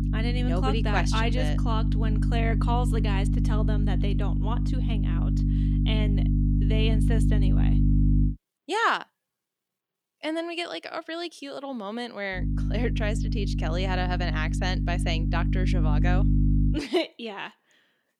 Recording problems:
electrical hum; loud; until 8.5 s and from 12 to 17 s; 50 Hz, 5 dB below the speech

